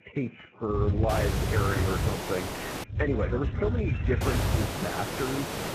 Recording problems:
garbled, watery; badly
hiss; loud; from 1 to 3 s and from 4 s on; 2 dB below the speech
animal sounds; noticeable; throughout; 15 dB below the speech
low rumble; noticeable; from 0.5 to 2 s and from 3 to 4.5 s; 10 dB below the speech
high-pitched whine; faint; throughout; 2.5 kHz, 30 dB below the speech

